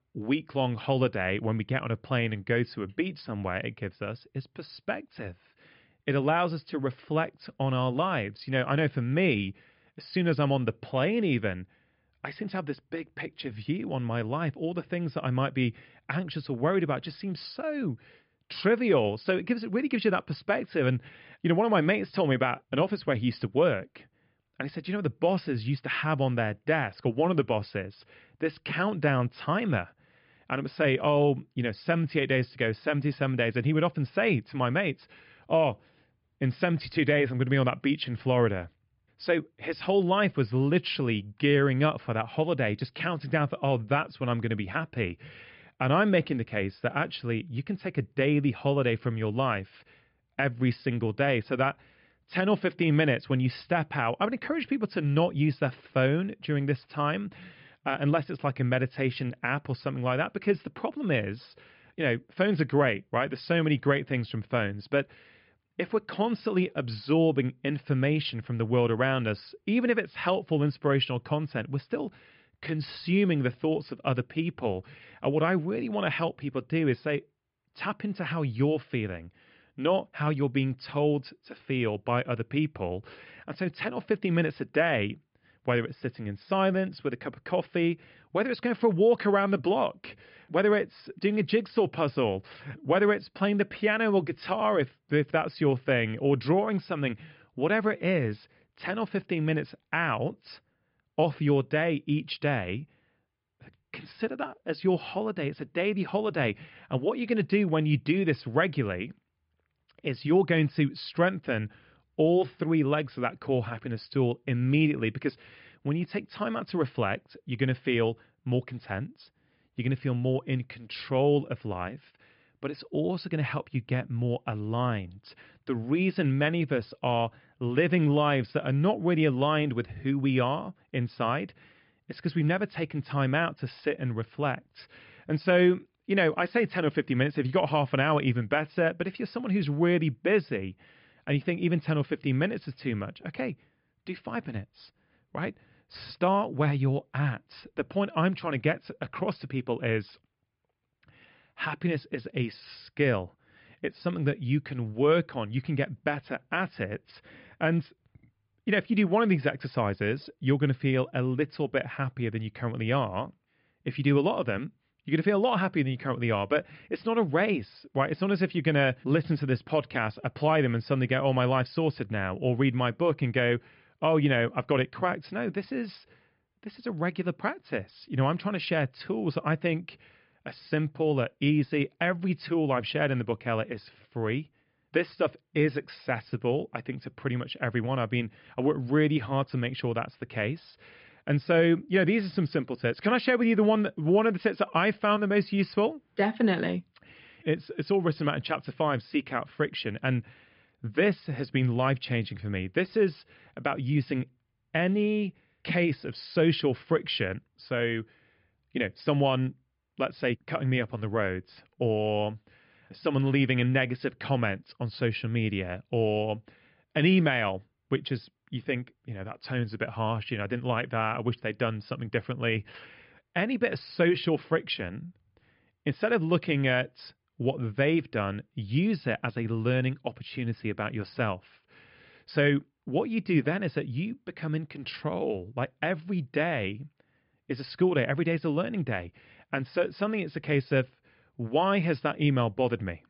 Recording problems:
high frequencies cut off; noticeable; nothing above 5.5 kHz
muffled; very slightly; fading above 3 kHz

